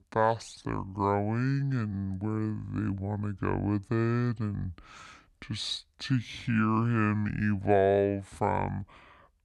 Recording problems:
wrong speed and pitch; too slow and too low; 0.6 times normal speed

